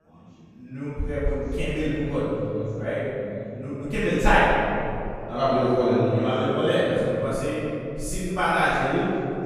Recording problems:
room echo; strong; dies away in 2.9 s
off-mic speech; far
background chatter; faint; throughout; 4 voices, 30 dB below the speech

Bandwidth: 15 kHz